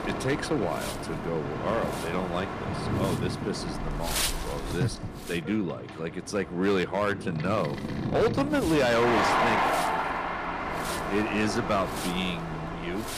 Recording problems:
distortion; slight; 5% of the sound clipped
wind noise on the microphone; heavy; until 5.5 s and from 7.5 s on; 8 dB below the speech
train or aircraft noise; loud; throughout; 2 dB below the speech

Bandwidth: 15 kHz